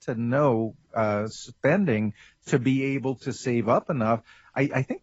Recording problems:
garbled, watery; badly; nothing above 7.5 kHz

